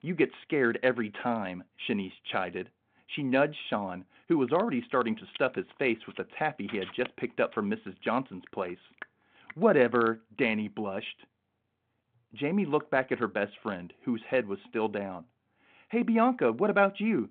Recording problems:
phone-call audio

